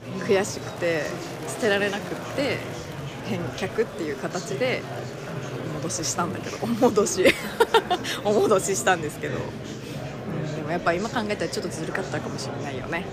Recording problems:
murmuring crowd; loud; throughout; 8 dB below the speech

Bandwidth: 15 kHz